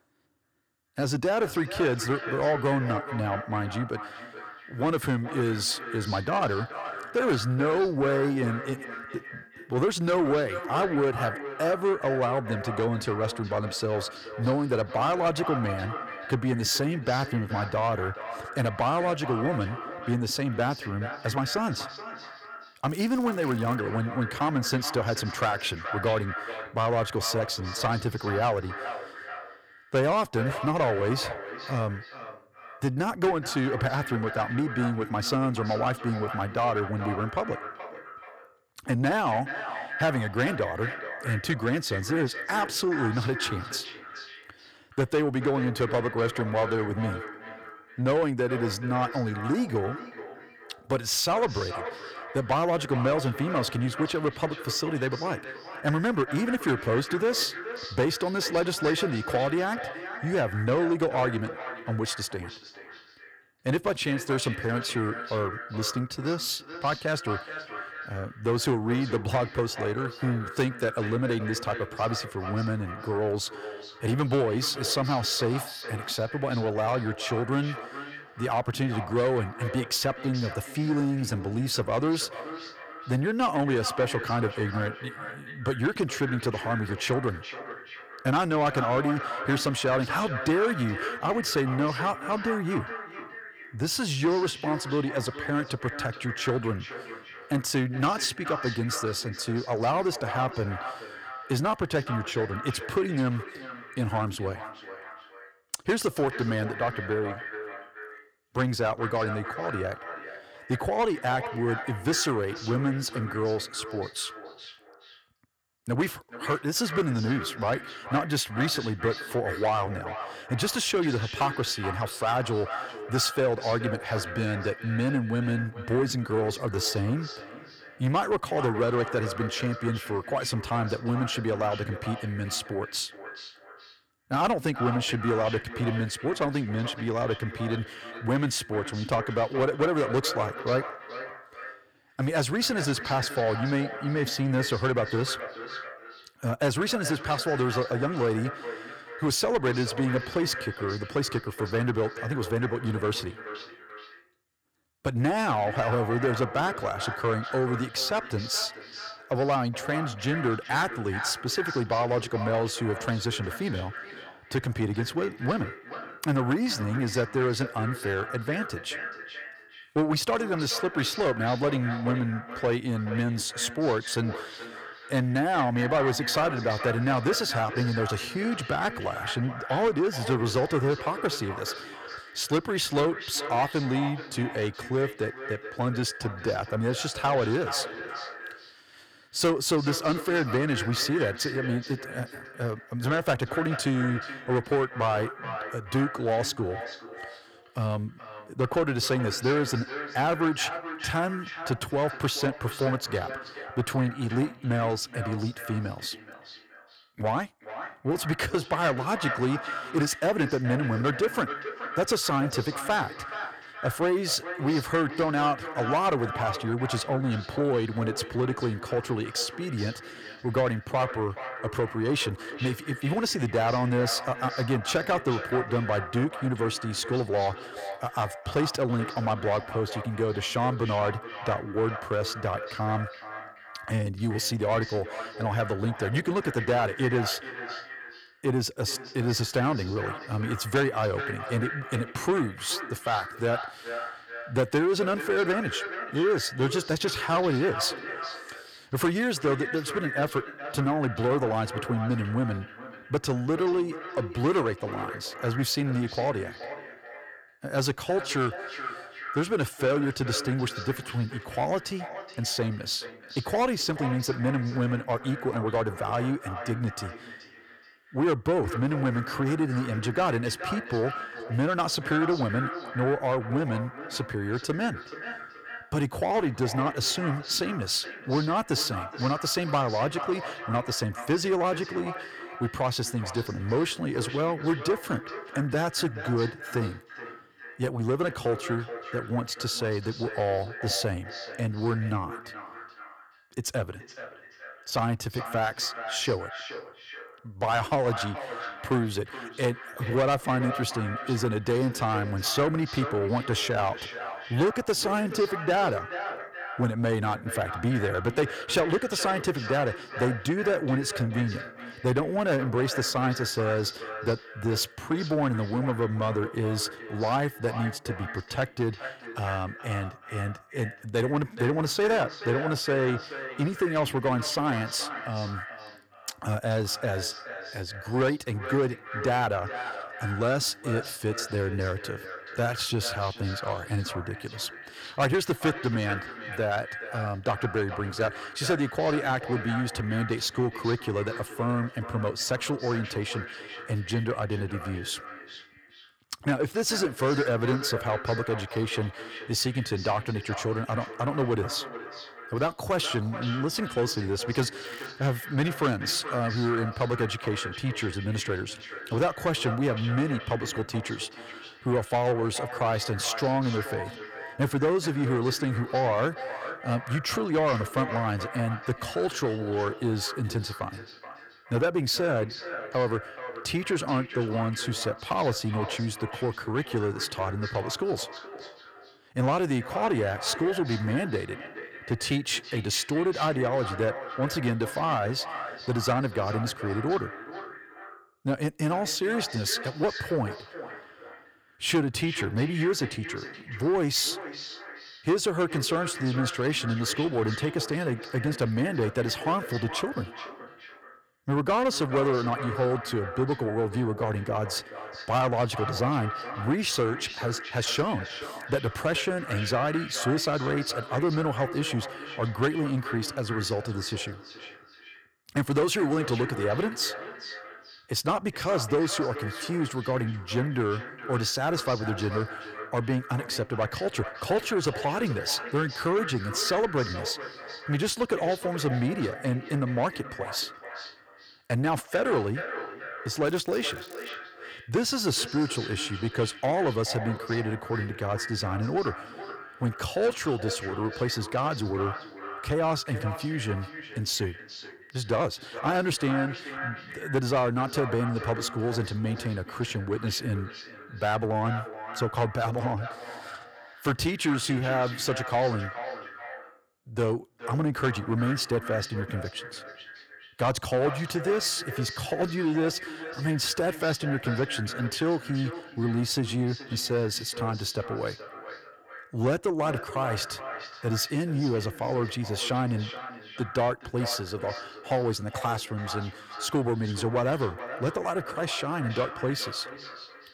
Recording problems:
echo of what is said; strong; throughout; 420 ms later, 10 dB below the speech
distortion; slight; 10 dB below the speech
crackling; faint; at 23 s, at 5:55 and at 7:13; 25 dB below the speech

